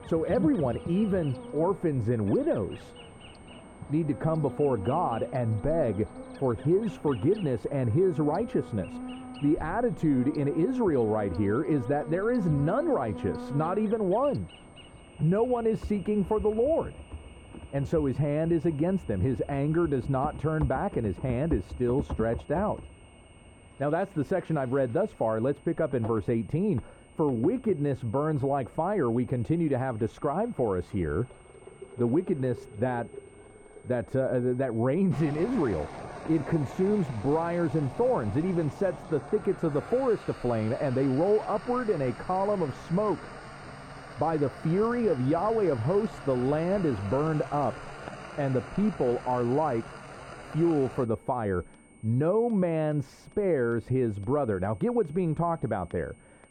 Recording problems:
muffled; very; fading above 2 kHz
animal sounds; noticeable; throughout; 15 dB below the speech
household noises; noticeable; throughout; 15 dB below the speech
high-pitched whine; faint; throughout; 2 kHz, 35 dB below the speech

